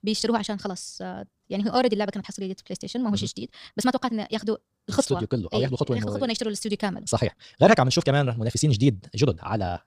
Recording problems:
wrong speed, natural pitch; too fast; 1.6 times normal speed

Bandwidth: 15 kHz